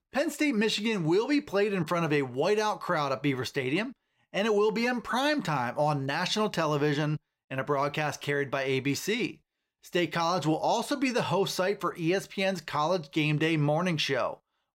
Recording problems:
none

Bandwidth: 16 kHz